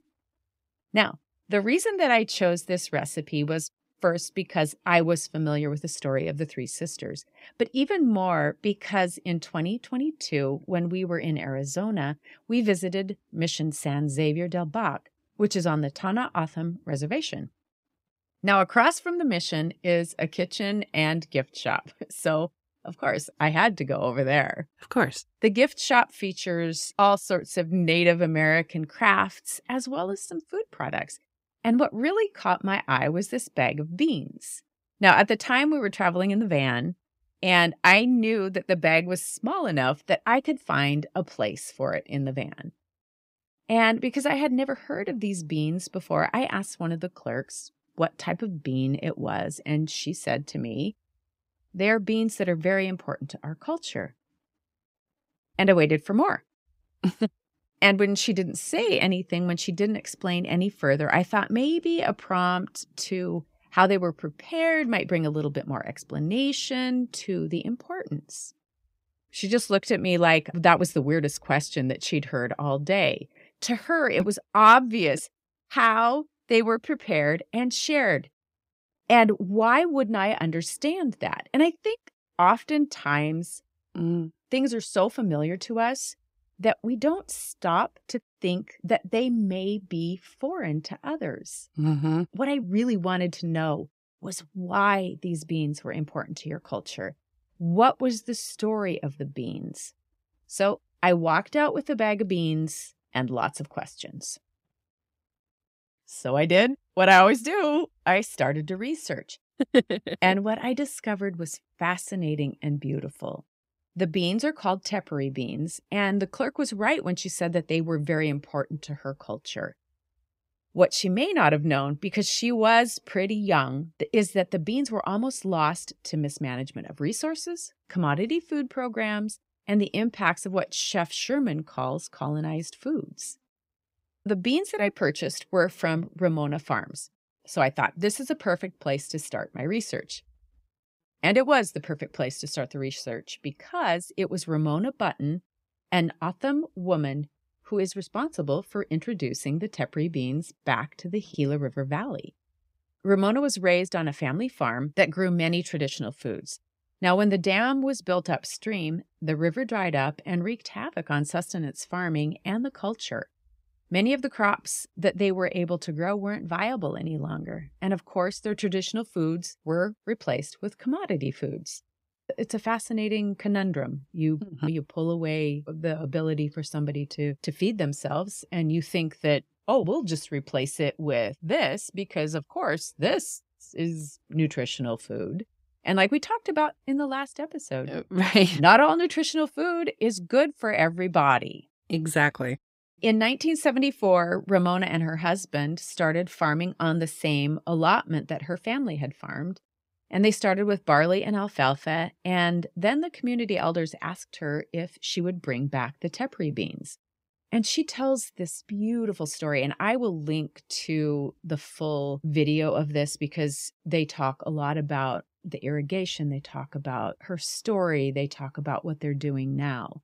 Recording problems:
none

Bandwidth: 15.5 kHz